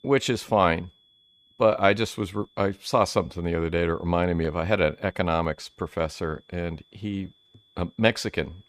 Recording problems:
high-pitched whine; faint; throughout; 3.5 kHz, 35 dB below the speech

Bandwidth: 15 kHz